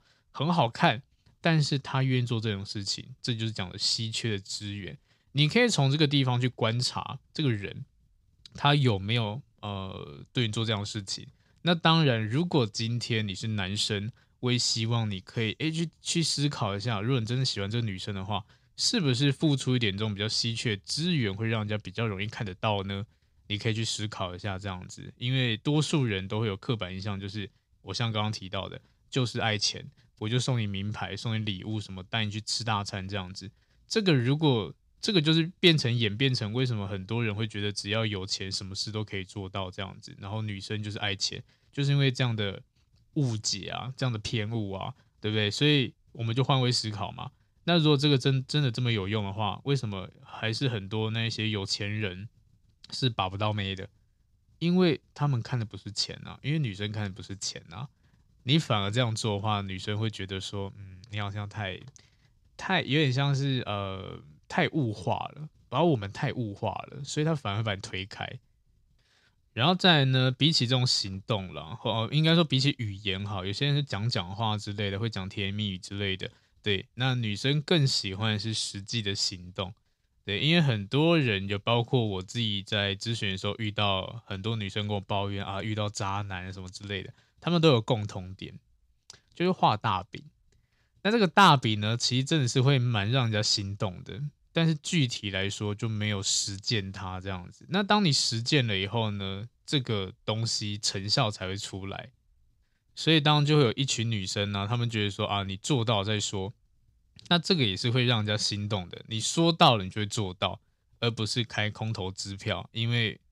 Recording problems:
none

